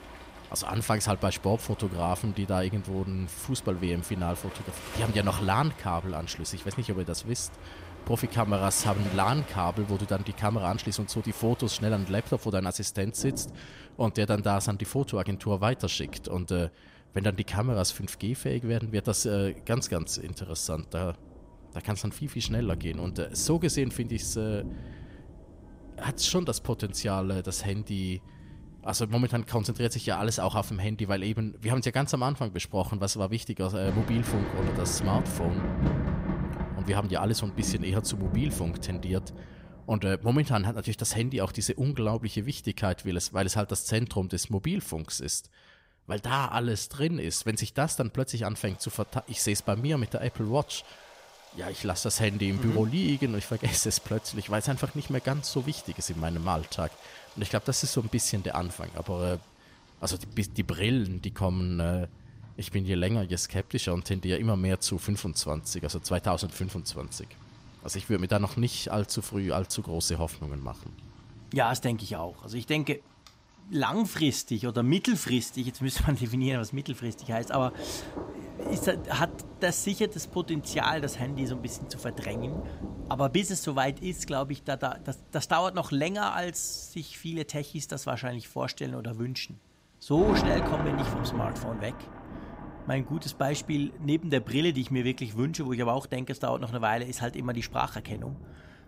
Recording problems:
rain or running water; noticeable; throughout; 10 dB below the speech

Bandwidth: 15.5 kHz